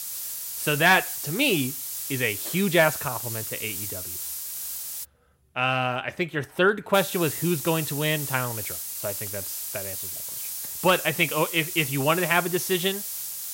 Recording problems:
hiss; loud; until 5 s and from 7 s on; 6 dB below the speech

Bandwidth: 16 kHz